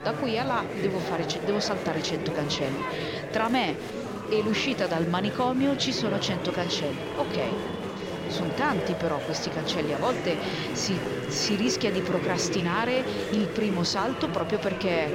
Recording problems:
chatter from many people; loud; throughout; 3 dB below the speech

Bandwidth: 16 kHz